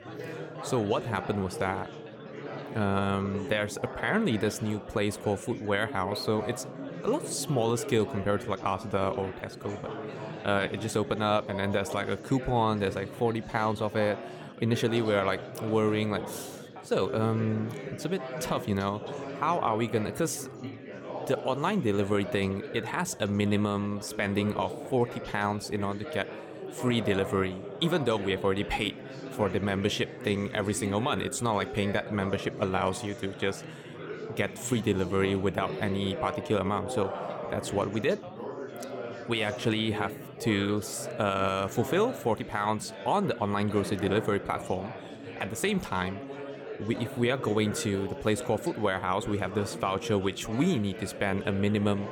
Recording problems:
chatter from many people; loud; throughout; 10 dB below the speech

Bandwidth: 17 kHz